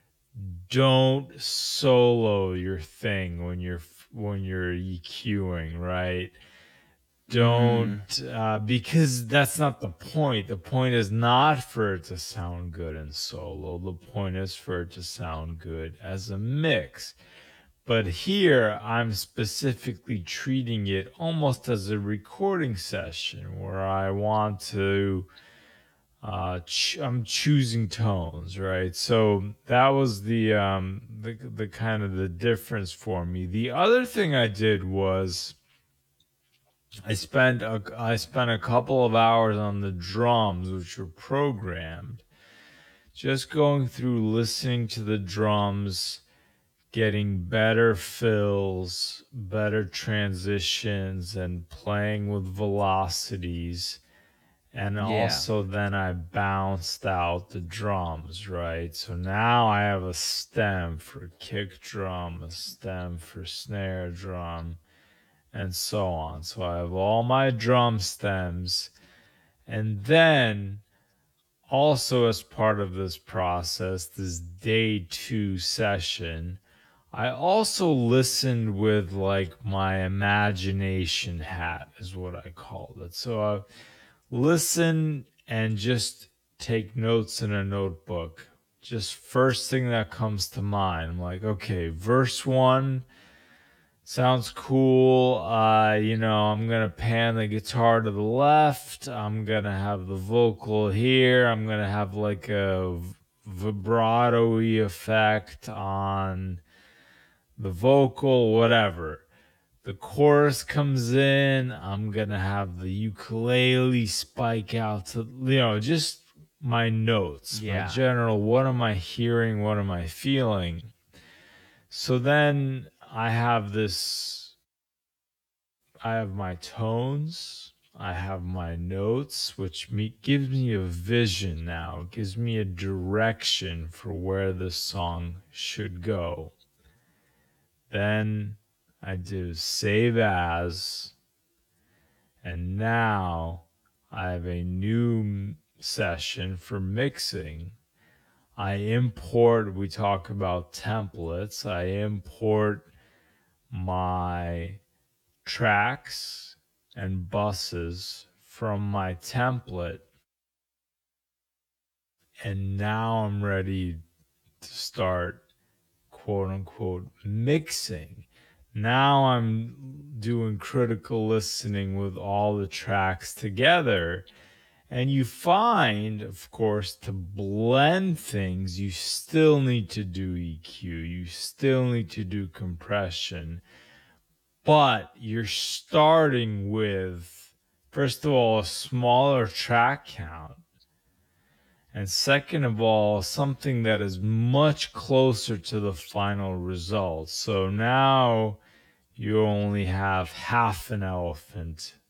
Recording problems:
wrong speed, natural pitch; too slow; 0.6 times normal speed

